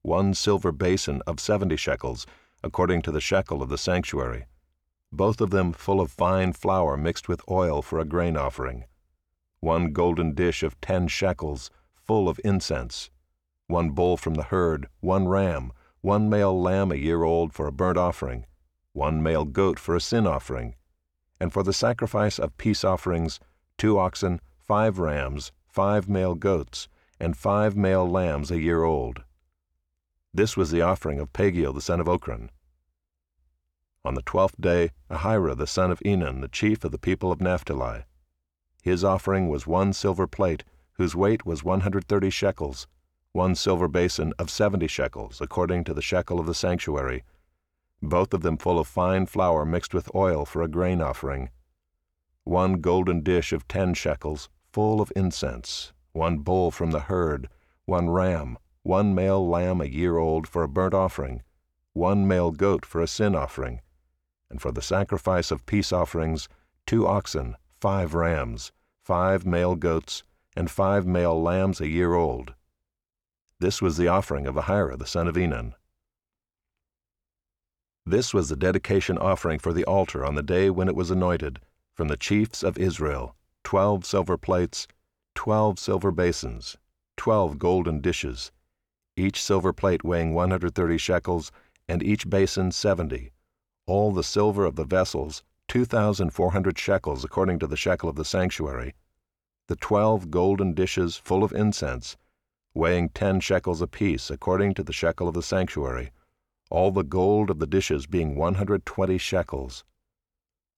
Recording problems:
none

